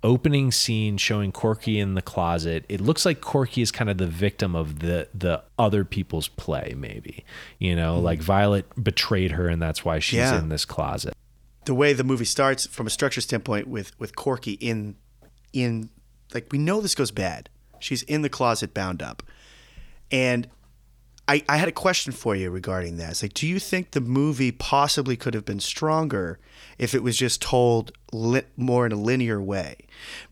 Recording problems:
none

